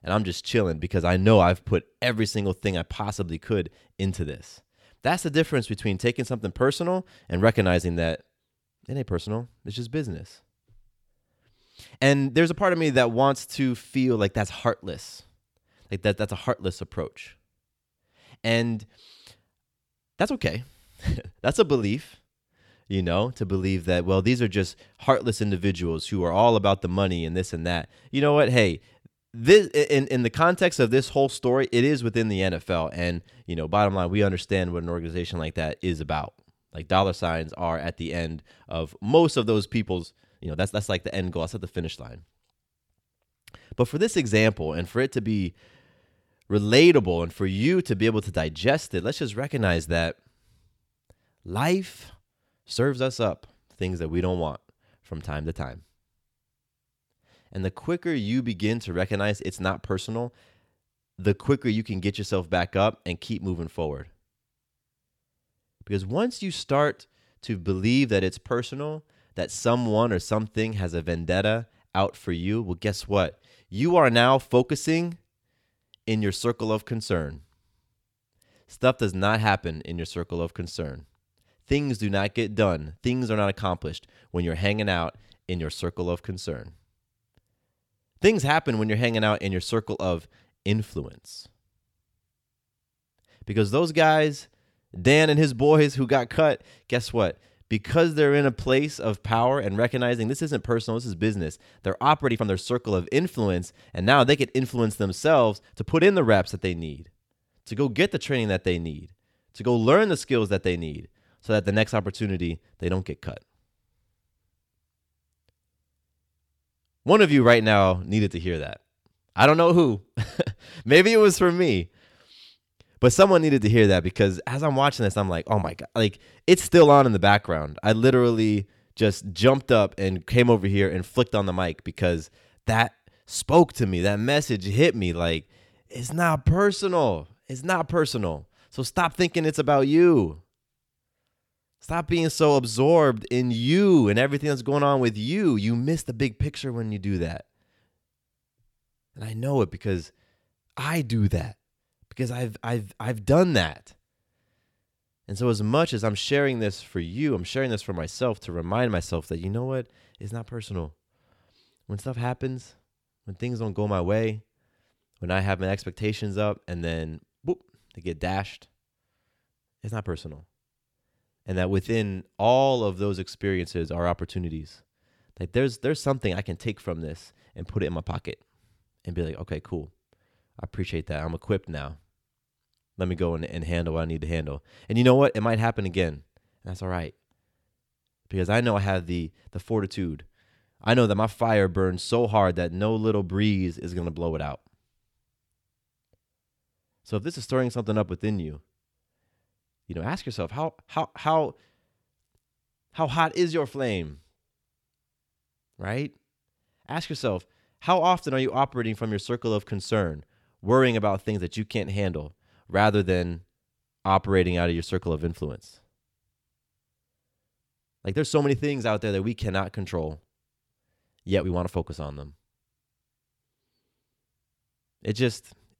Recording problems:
uneven, jittery; strongly; from 9 s to 3:42

